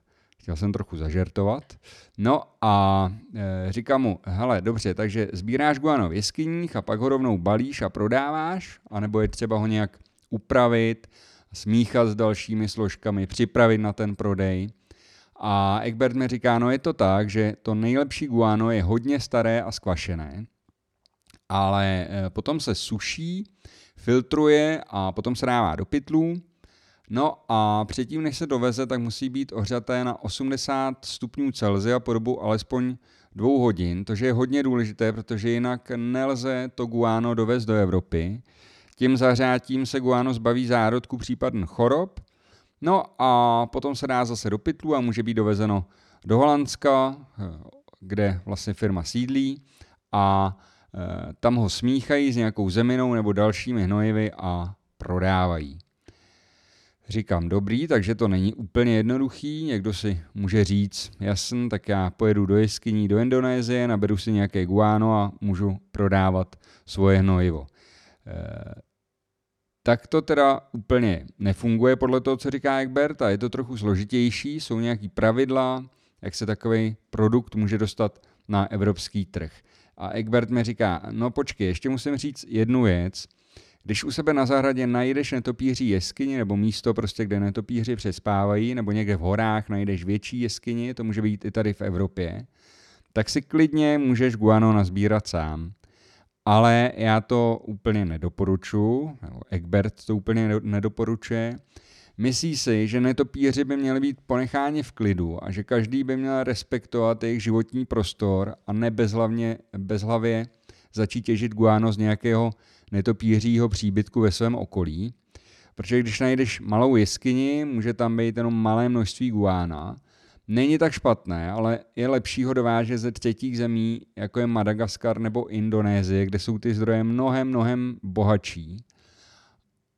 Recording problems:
none

